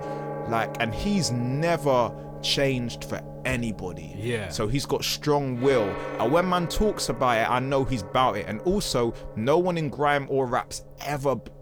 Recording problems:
background music; noticeable; throughout; 10 dB below the speech

